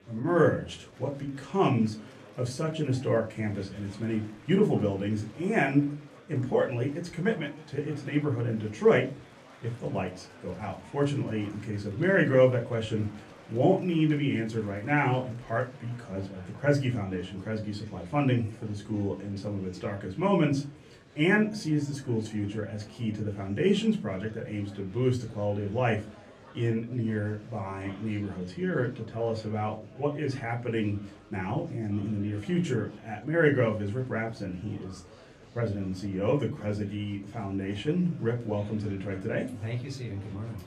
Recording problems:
off-mic speech; far
room echo; very slight; dies away in 0.3 s
murmuring crowd; faint; throughout; 20 dB below the speech

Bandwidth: 14.5 kHz